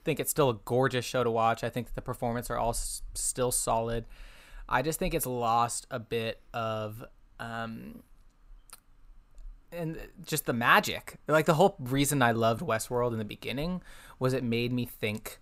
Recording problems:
none

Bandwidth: 15.5 kHz